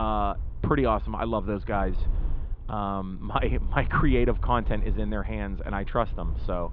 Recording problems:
muffled; very; fading above 3.5 kHz
low rumble; faint; throughout; 25 dB below the speech
abrupt cut into speech; at the start

